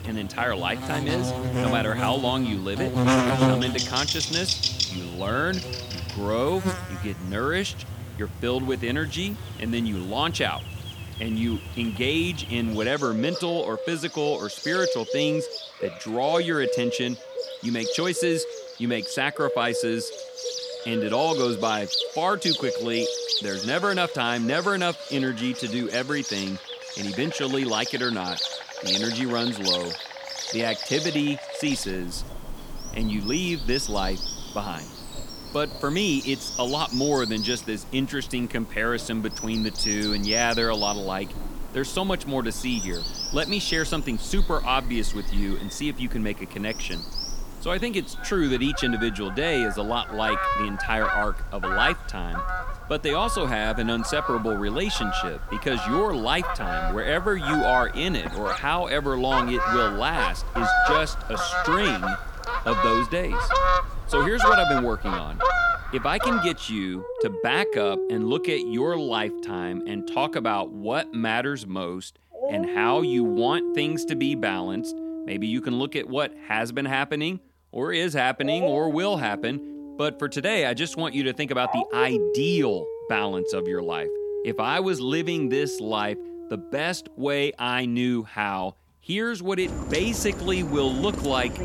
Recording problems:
animal sounds; loud; throughout; 2 dB below the speech

